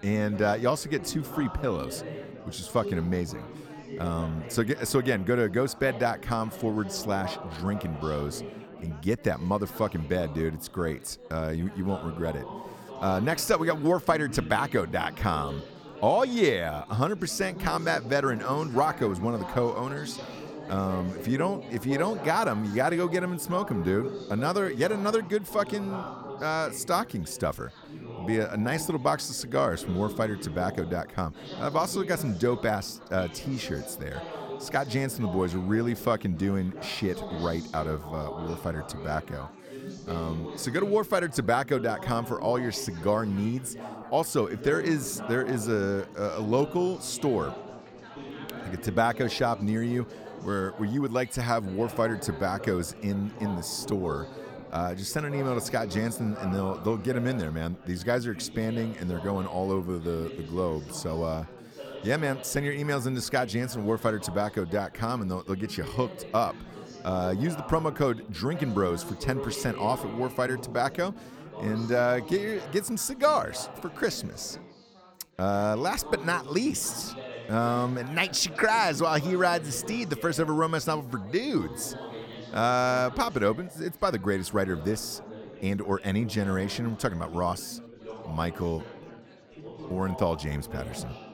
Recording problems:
chatter from many people; noticeable; throughout; 10 dB below the speech

